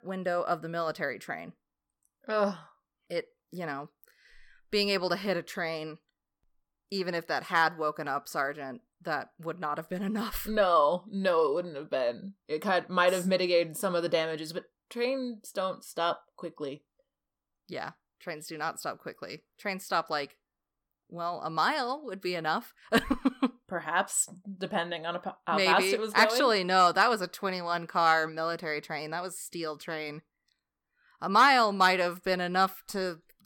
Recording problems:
none

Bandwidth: 17.5 kHz